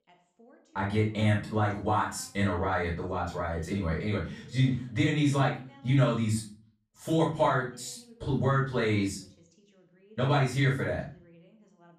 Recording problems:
off-mic speech; far
room echo; noticeable; dies away in 0.4 s
voice in the background; faint; throughout; 30 dB below the speech

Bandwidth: 14.5 kHz